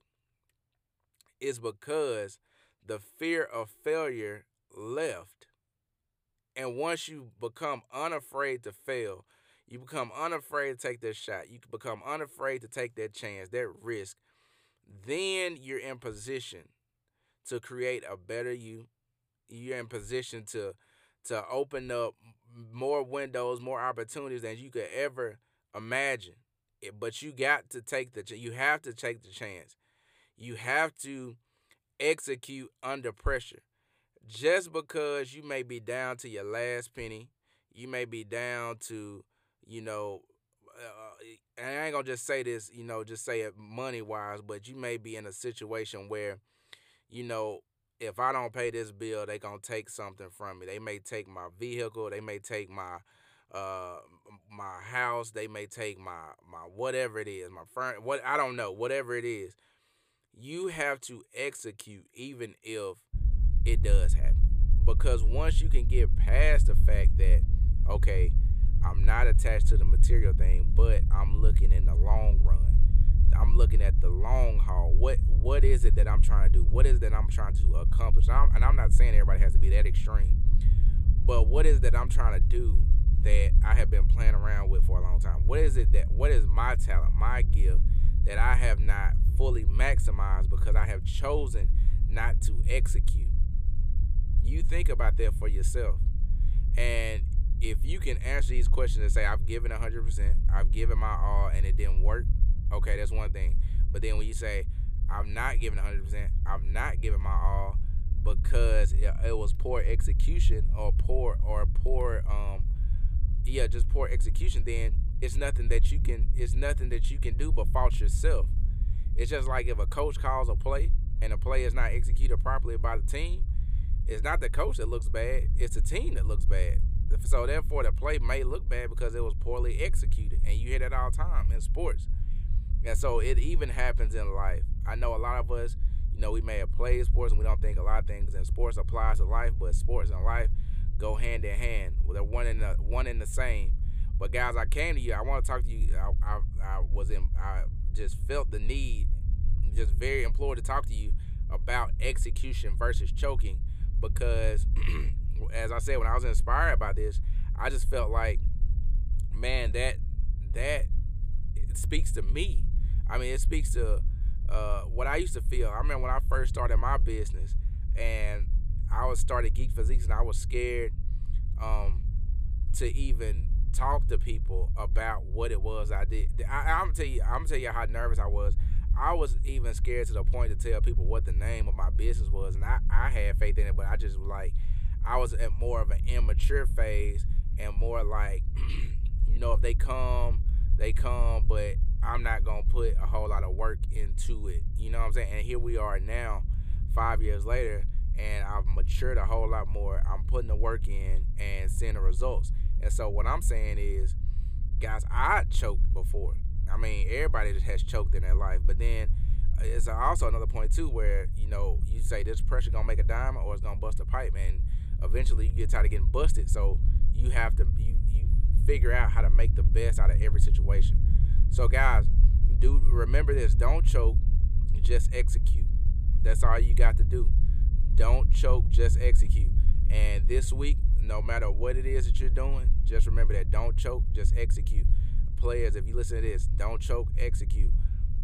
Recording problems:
low rumble; noticeable; from 1:03 on; 15 dB below the speech

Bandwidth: 15 kHz